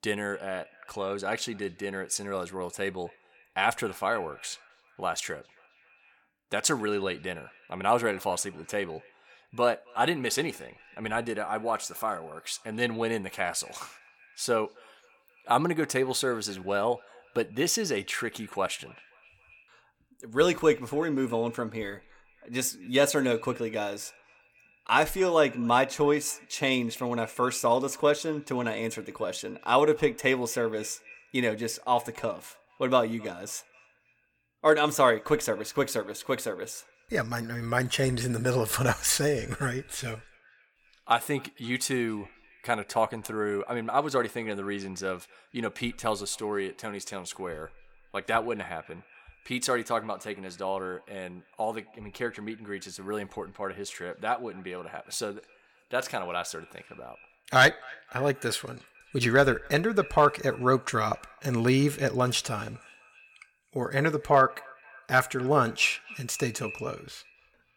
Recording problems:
echo of what is said; faint; throughout; 260 ms later, 25 dB below the speech

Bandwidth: 17.5 kHz